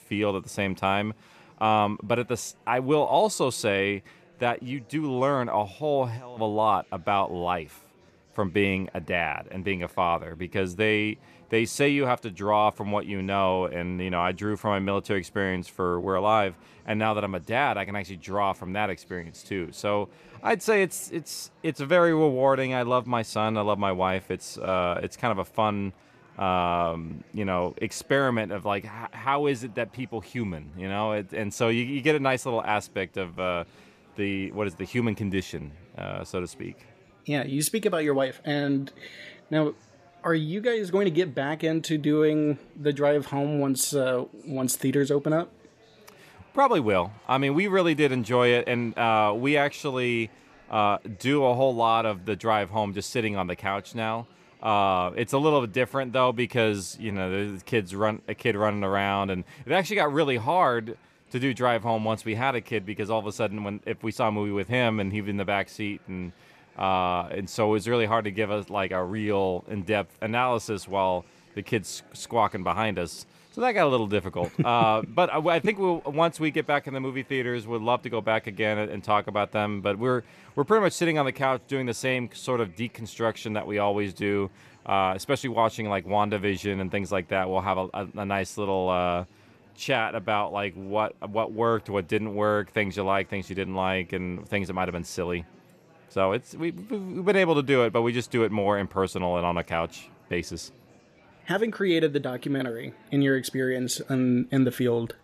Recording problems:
murmuring crowd; faint; throughout; 30 dB below the speech

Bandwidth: 14.5 kHz